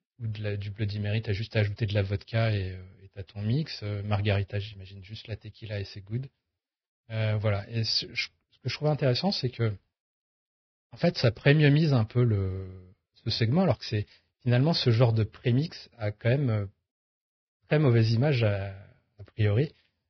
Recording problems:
garbled, watery; badly; nothing above 5.5 kHz

